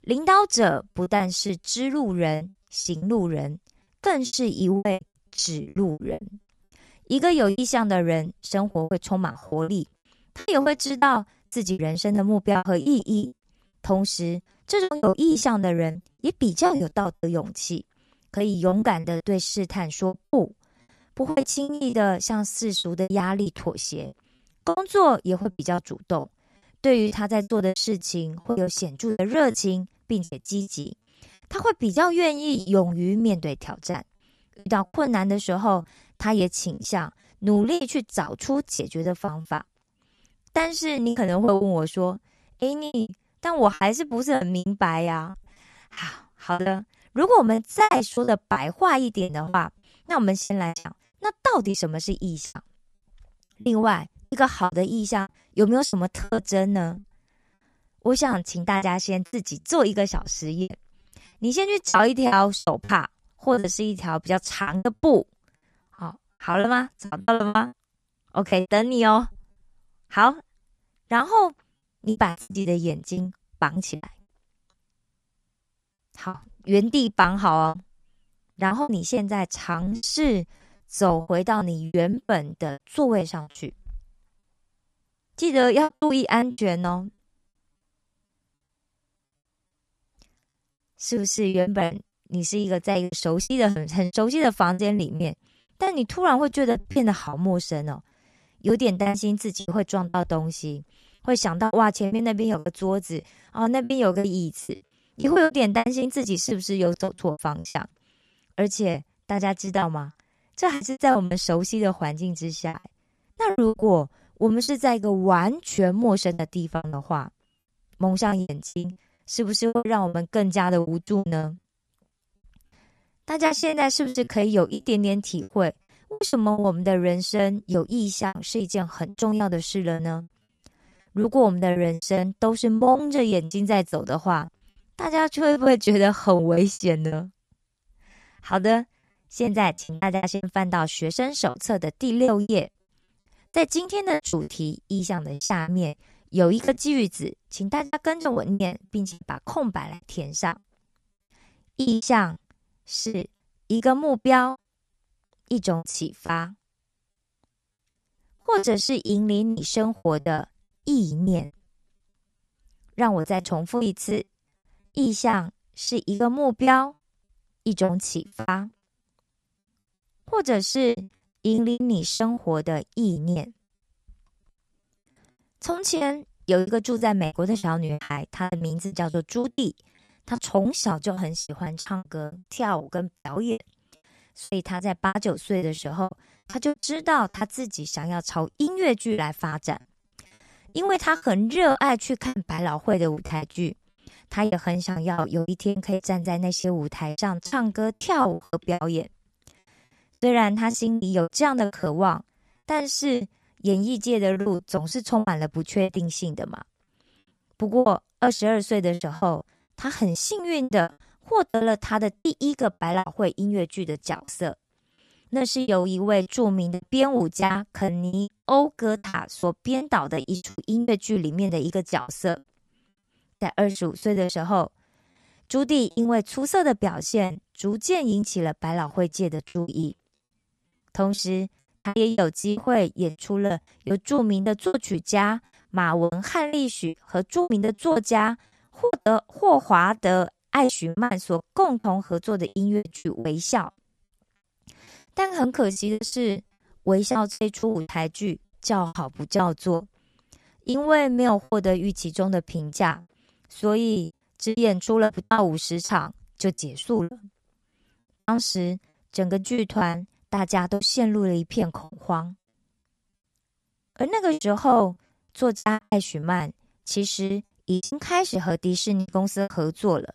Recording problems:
choppy; very; 16% of the speech affected

